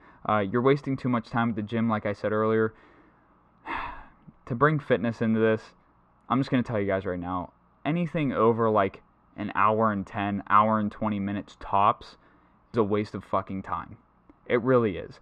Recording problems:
muffled; very; fading above 2.5 kHz

